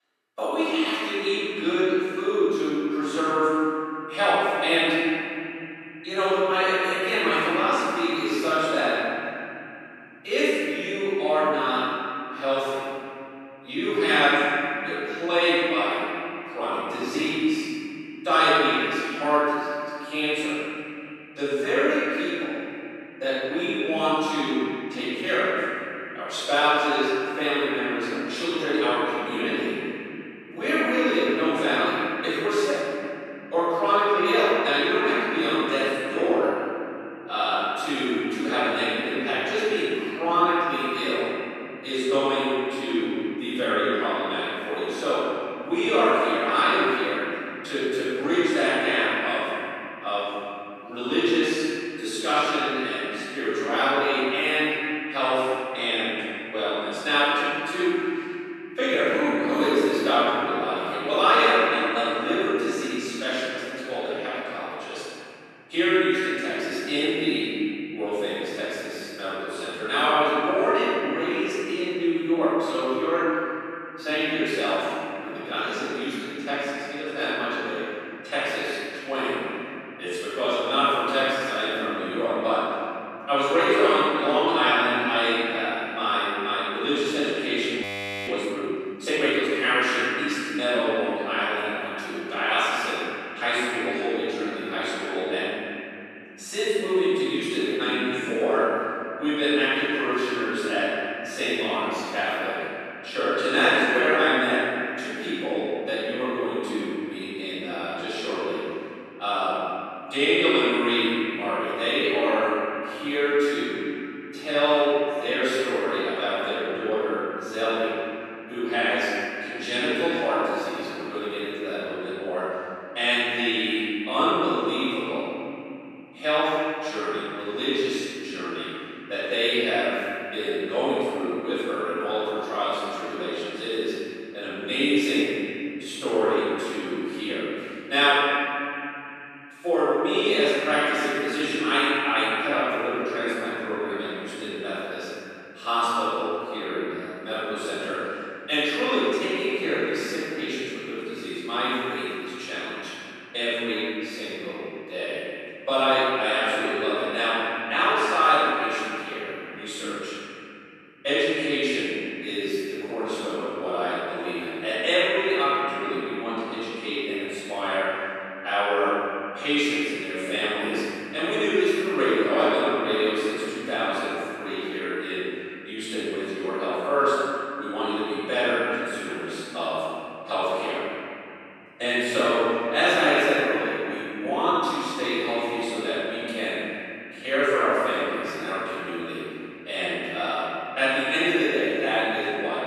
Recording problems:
room echo; strong; dies away in 3 s
off-mic speech; far
thin; somewhat; fading below 300 Hz
audio freezing; at 1:28

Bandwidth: 13.5 kHz